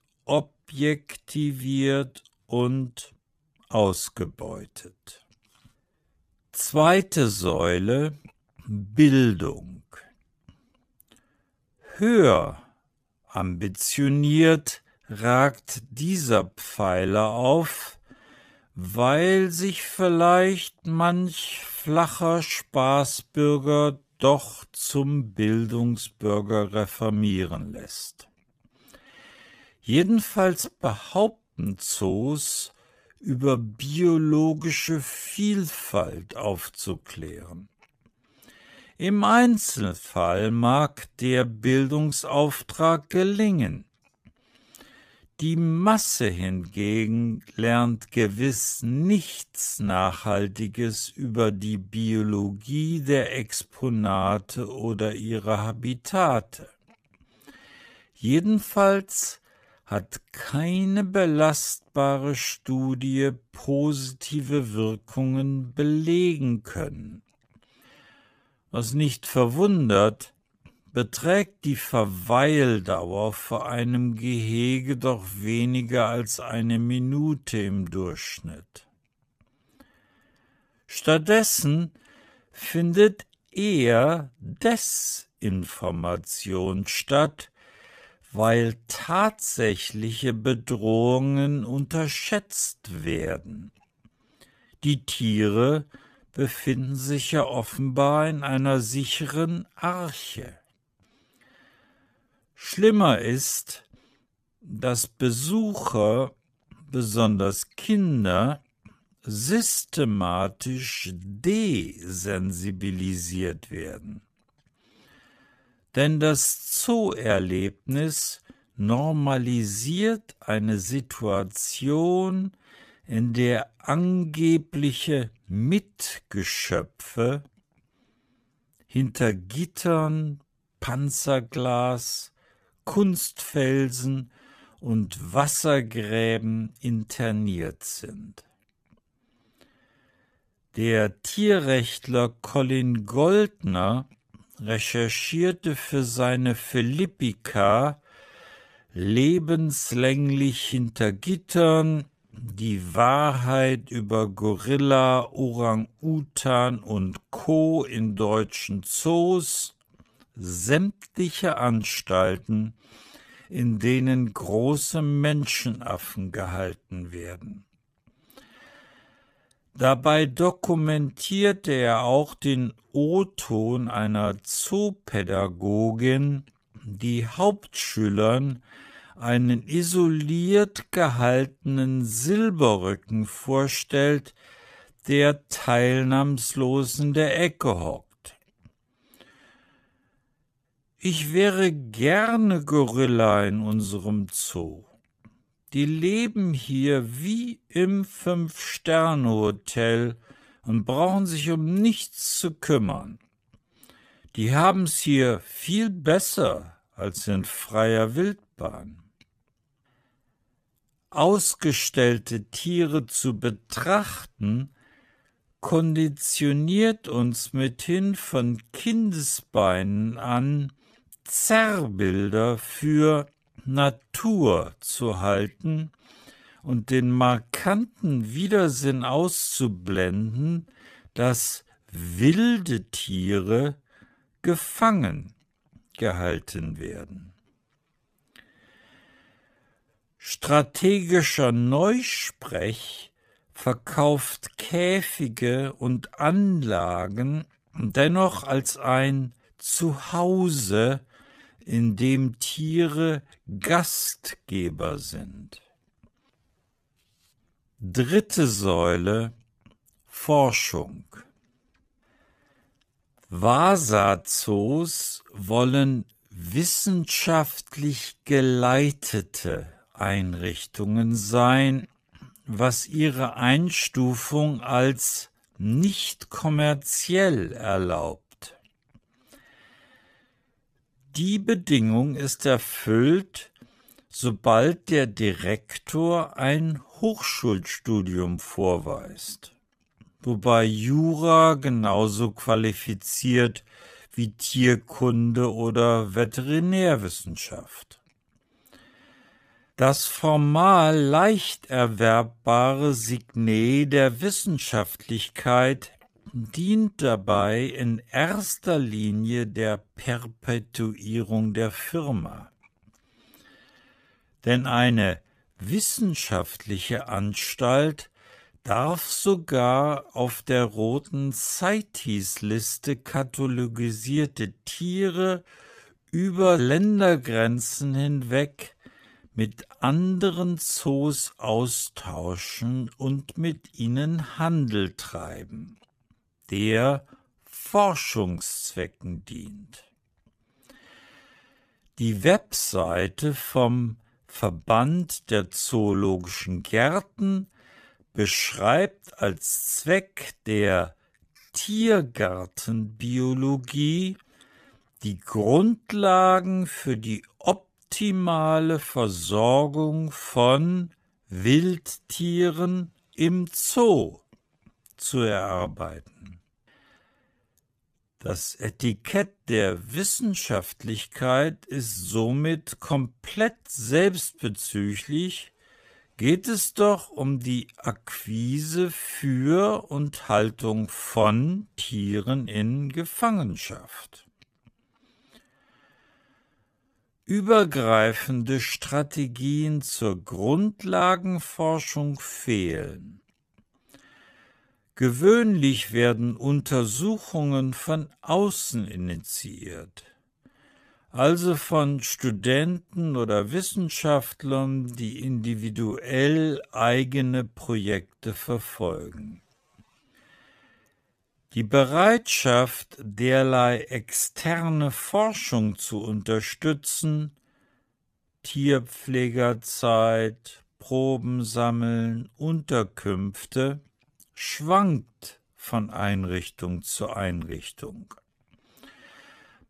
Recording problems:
wrong speed, natural pitch; too slow; 0.6 times normal speed

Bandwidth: 15 kHz